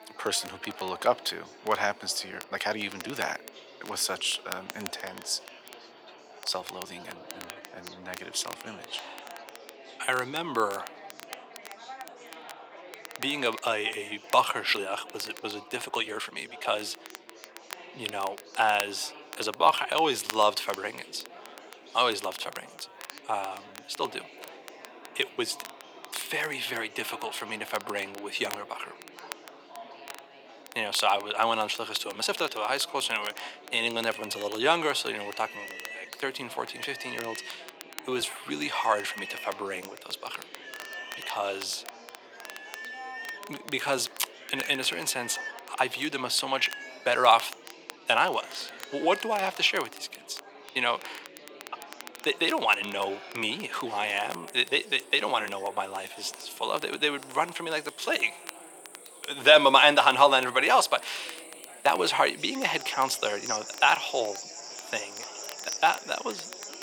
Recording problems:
thin; very; fading below 450 Hz
animal sounds; noticeable; throughout; 15 dB below the speech
crackle, like an old record; noticeable; 20 dB below the speech
chatter from many people; faint; throughout; 20 dB below the speech
uneven, jittery; strongly; from 2 to 54 s

